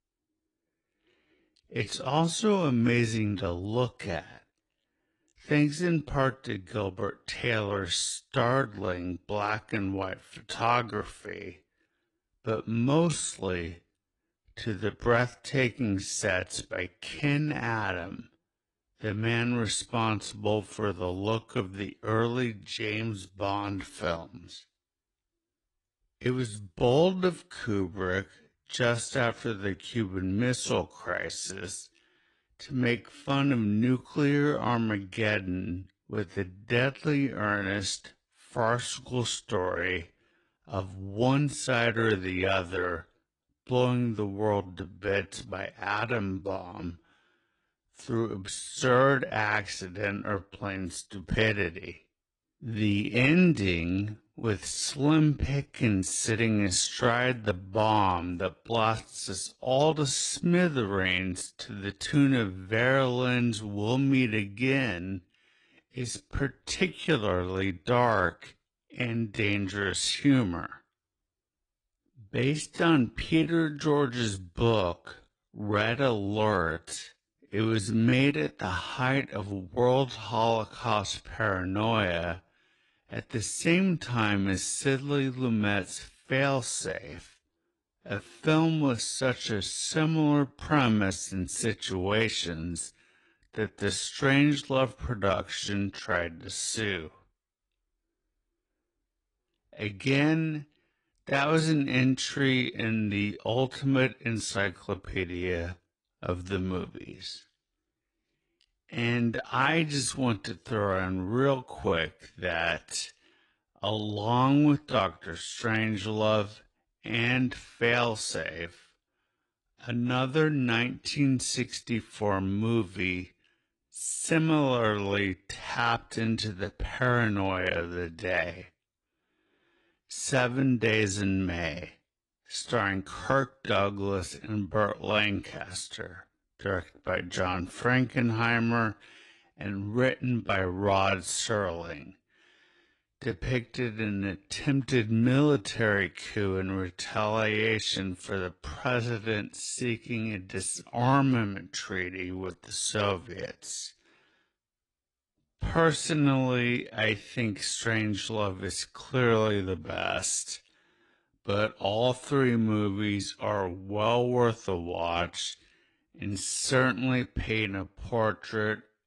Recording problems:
wrong speed, natural pitch; too slow; 0.5 times normal speed
garbled, watery; slightly

